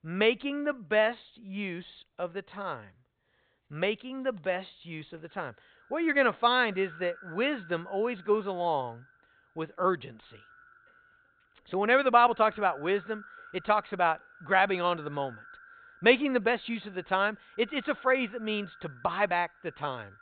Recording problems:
high frequencies cut off; severe; nothing above 4 kHz
echo of what is said; faint; from 5.5 s on; 100 ms later, 25 dB below the speech

